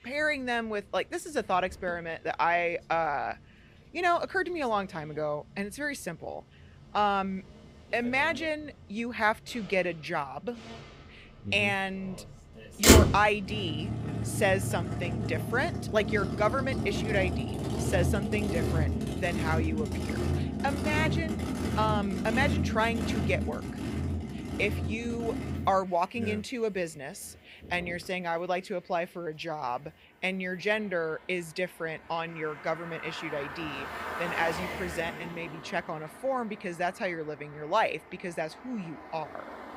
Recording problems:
traffic noise; very loud; throughout; as loud as the speech

